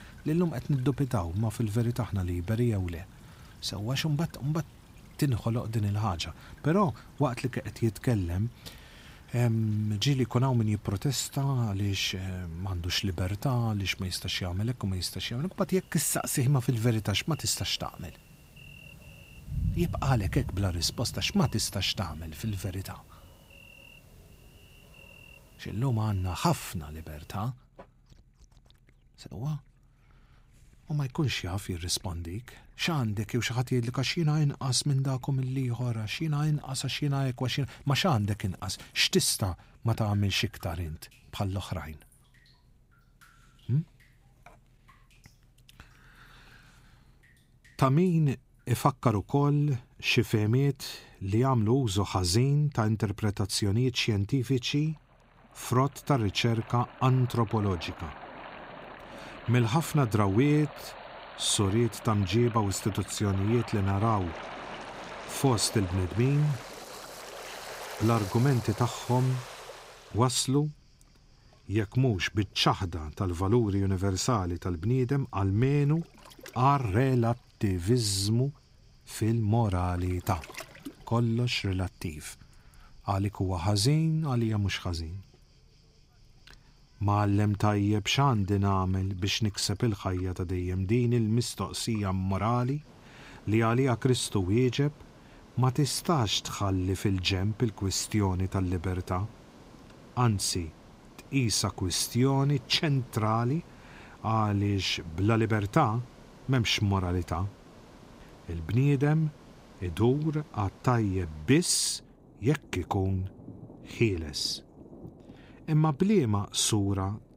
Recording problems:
rain or running water; noticeable; throughout; 20 dB below the speech

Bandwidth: 15.5 kHz